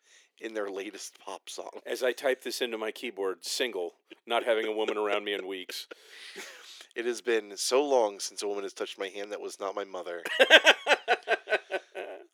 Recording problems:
thin; very; fading below 350 Hz

